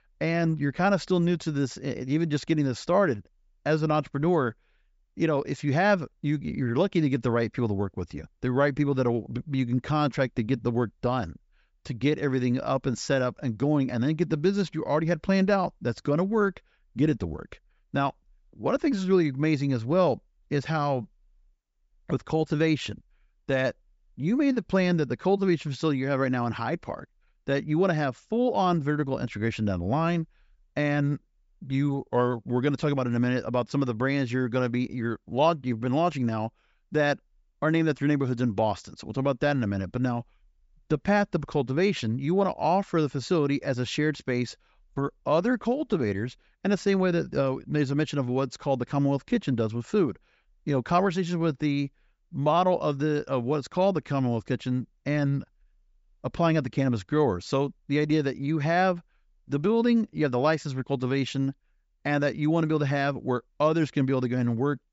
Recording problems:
high frequencies cut off; noticeable; nothing above 8 kHz

